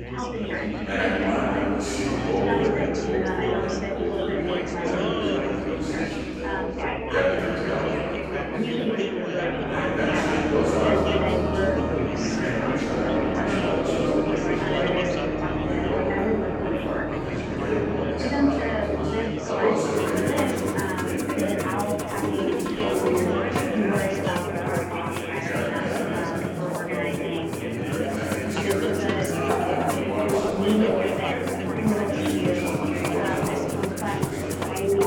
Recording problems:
room echo; strong; dies away in 2.9 s
off-mic speech; far
chatter from many people; very loud; throughout; 1 dB above the speech
background music; loud; throughout; 3 dB below the speech

